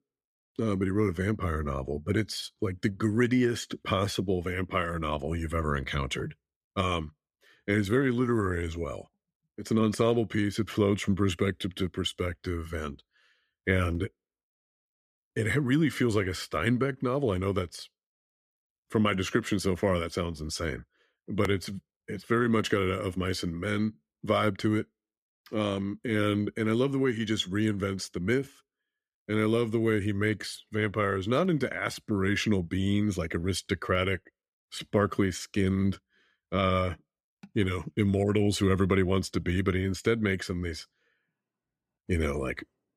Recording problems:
none

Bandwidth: 14.5 kHz